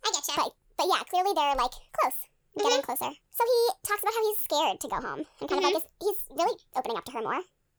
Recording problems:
wrong speed and pitch; too fast and too high; 1.6 times normal speed

